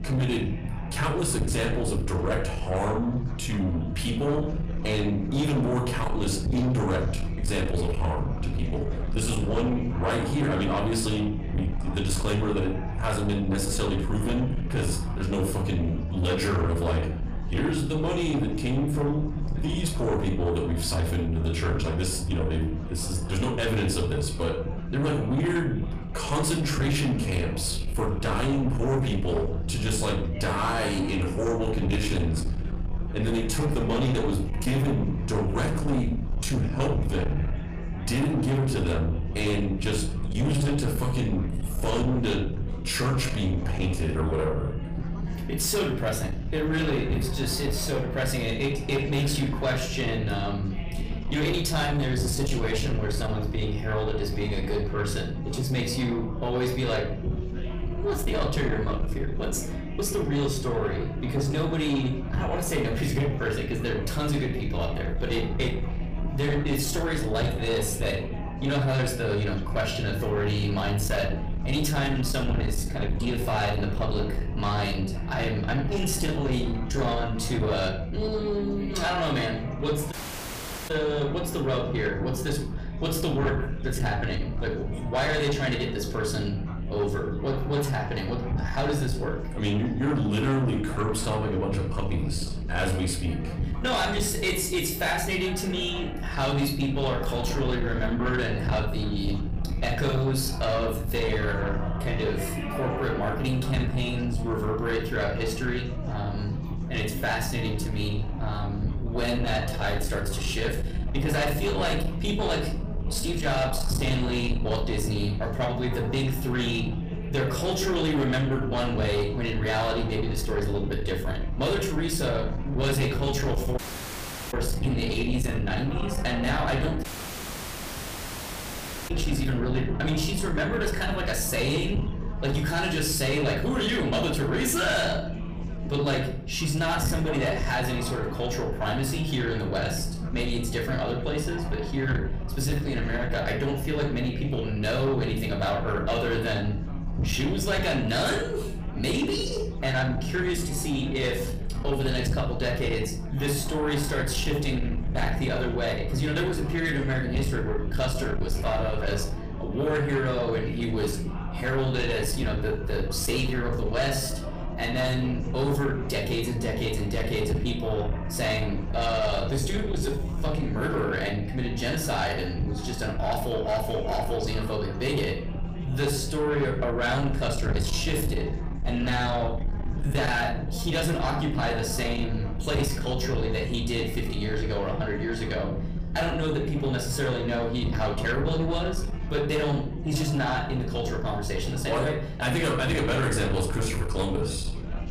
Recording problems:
room echo; slight; dies away in 0.5 s
distortion; slight; 10 dB below the speech
off-mic speech; somewhat distant
chatter from many people; noticeable; throughout; 15 dB below the speech
low rumble; noticeable; throughout; 15 dB below the speech
audio cutting out; at 1:20 for 1 s, at 2:04 for 0.5 s and at 2:07 for 2 s

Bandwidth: 15 kHz